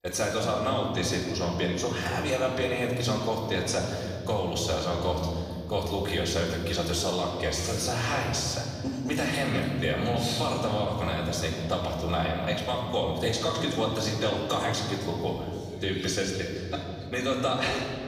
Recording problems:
off-mic speech; far
room echo; noticeable; dies away in 2.7 s

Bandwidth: 14.5 kHz